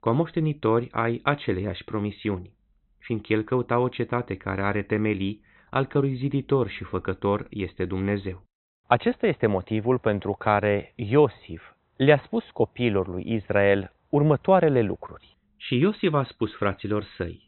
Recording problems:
high frequencies cut off; severe; nothing above 4 kHz

